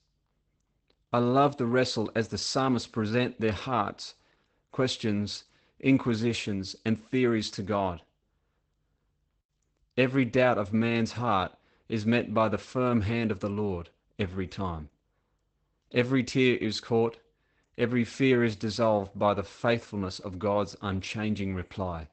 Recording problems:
garbled, watery; badly; nothing above 8 kHz

